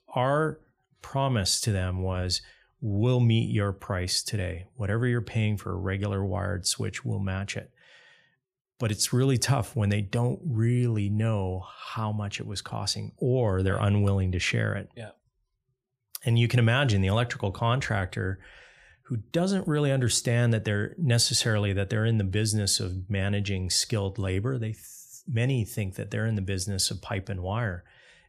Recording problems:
none

